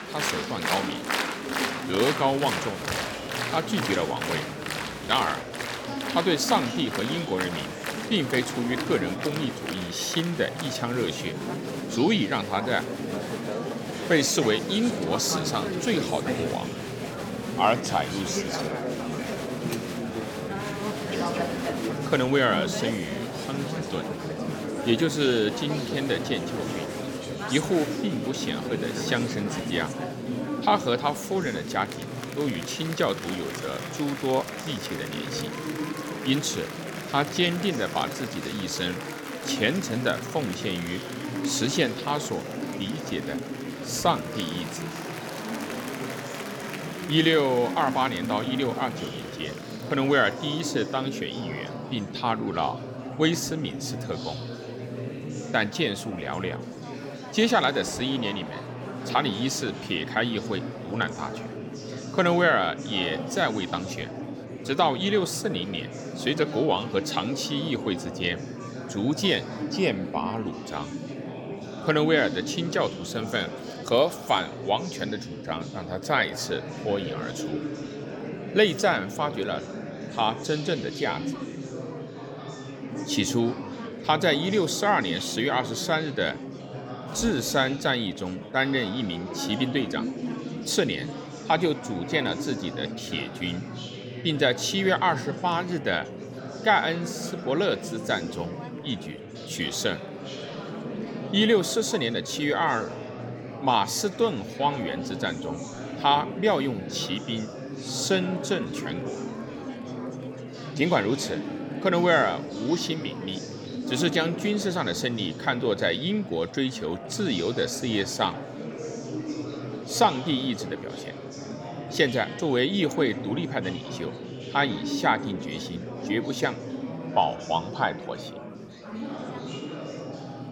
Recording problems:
murmuring crowd; loud; throughout; 7 dB below the speech

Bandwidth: 18 kHz